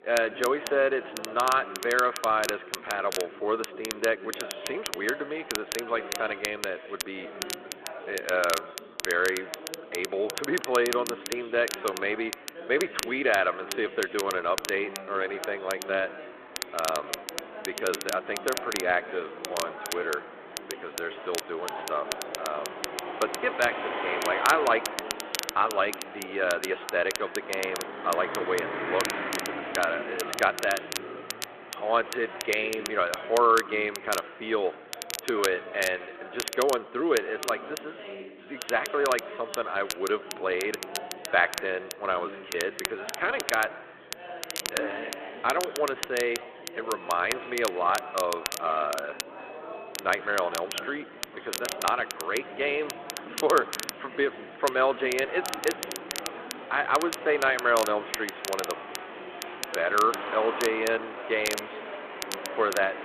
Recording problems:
echo of what is said; faint; throughout; 120 ms later, 20 dB below the speech
phone-call audio; nothing above 4 kHz
crackle, like an old record; loud; 8 dB below the speech
traffic noise; noticeable; from 16 s on; 10 dB below the speech
chatter from many people; noticeable; throughout; 15 dB below the speech

